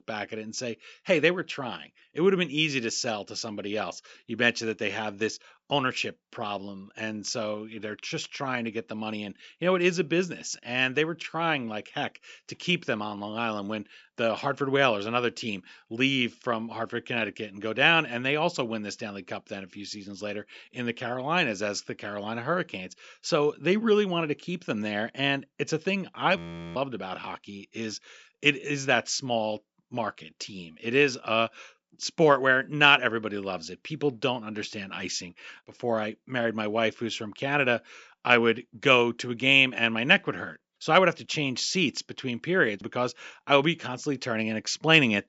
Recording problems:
high frequencies cut off; noticeable; nothing above 8 kHz
audio freezing; at 26 s

